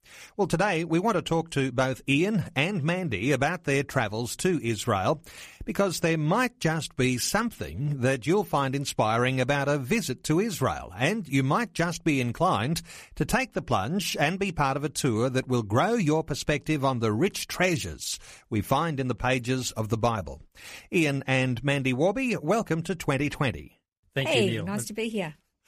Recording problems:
none

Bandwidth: 14.5 kHz